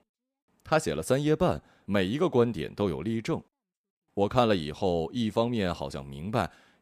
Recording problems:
none

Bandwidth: 15 kHz